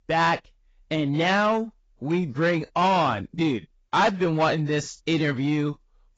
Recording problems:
garbled, watery; badly; nothing above 7.5 kHz
distortion; slight; 10 dB below the speech

